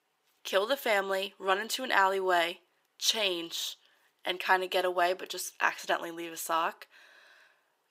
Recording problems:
thin; very; fading below 650 Hz

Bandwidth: 15.5 kHz